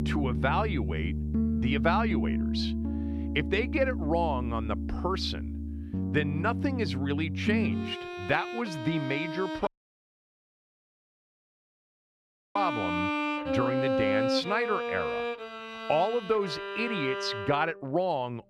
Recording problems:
background music; loud; throughout; 1 dB below the speech
audio cutting out; at 9.5 s for 3 s

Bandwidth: 14.5 kHz